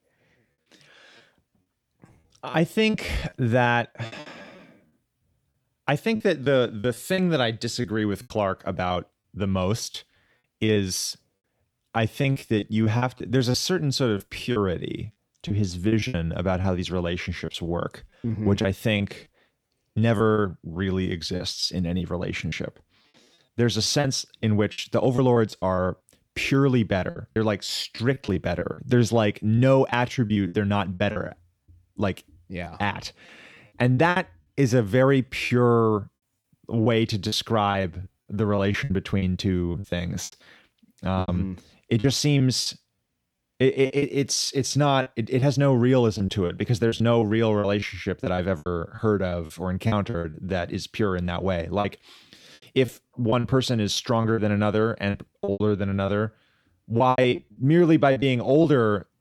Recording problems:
choppy; very; 10% of the speech affected

